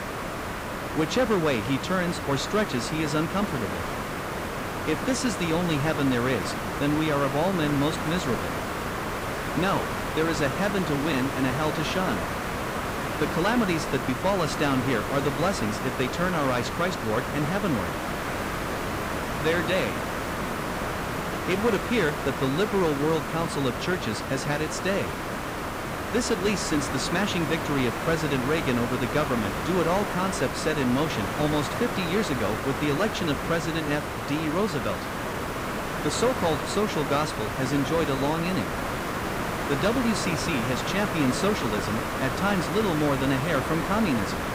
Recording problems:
hiss; loud; throughout; 3 dB below the speech

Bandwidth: 15.5 kHz